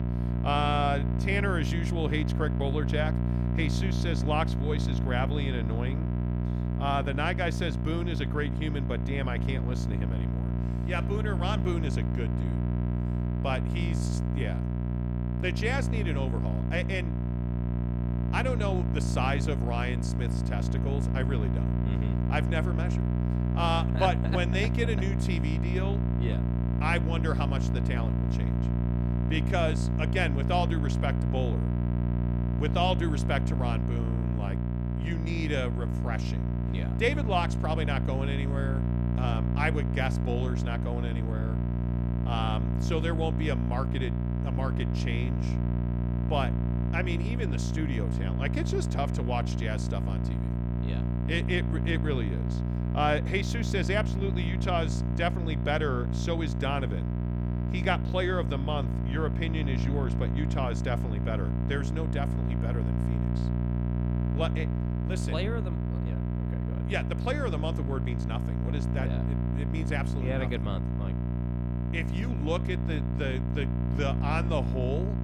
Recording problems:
electrical hum; loud; throughout; 60 Hz, 6 dB below the speech

